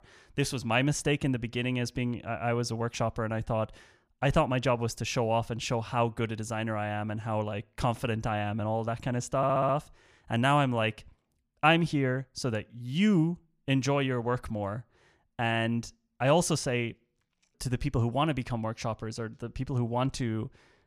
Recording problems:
audio stuttering; at 9.5 s

